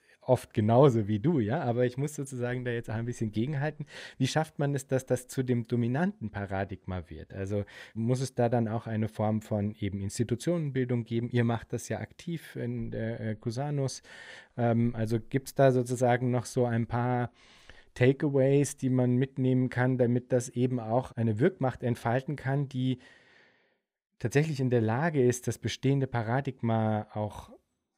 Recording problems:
none

